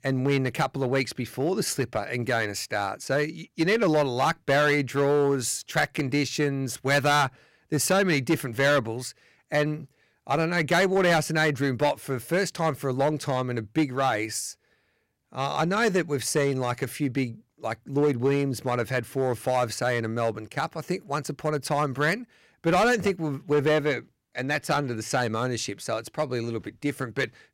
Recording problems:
distortion; slight; 5% of the sound clipped

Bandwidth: 16 kHz